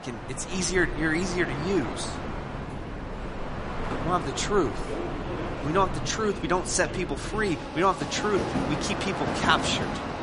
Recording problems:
garbled, watery; slightly; nothing above 10.5 kHz
train or aircraft noise; loud; throughout; 5 dB below the speech

